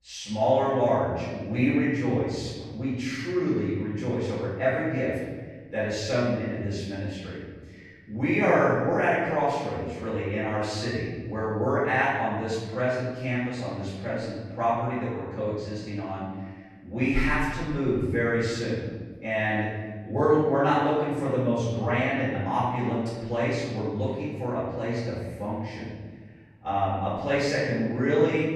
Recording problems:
room echo; strong; dies away in 1.4 s
off-mic speech; far

